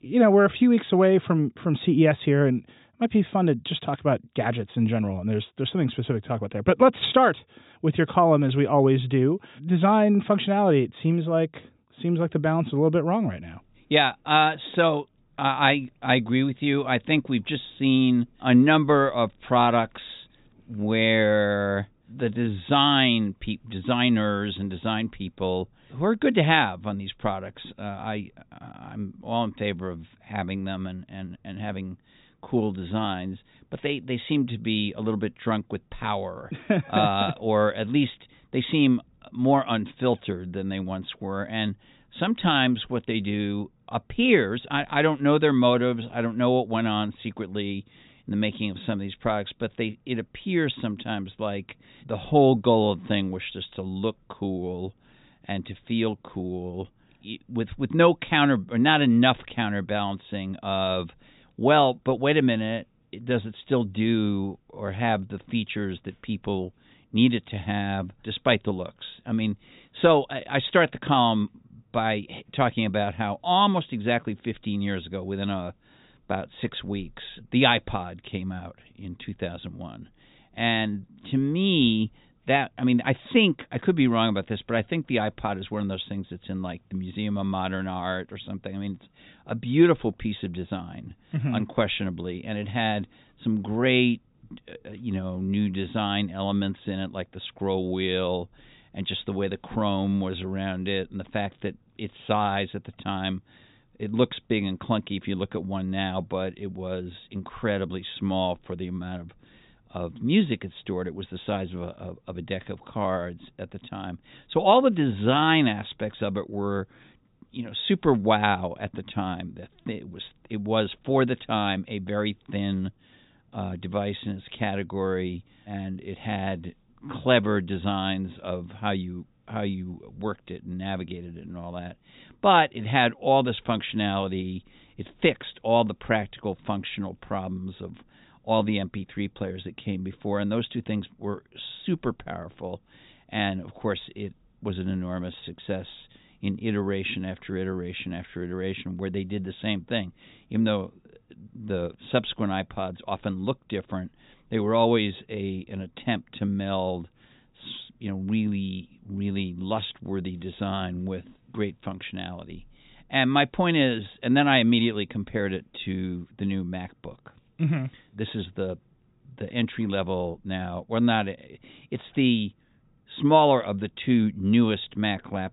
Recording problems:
high frequencies cut off; severe; nothing above 4 kHz

